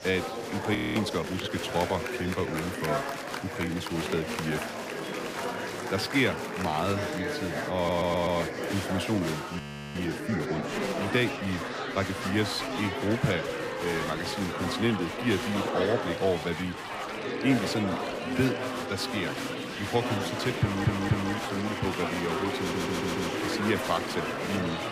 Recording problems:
murmuring crowd; loud; throughout; 2 dB below the speech
rain or running water; noticeable; throughout; 15 dB below the speech
audio freezing; at 1 s and at 9.5 s
audio stuttering; at 8 s, at 21 s and at 23 s

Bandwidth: 15 kHz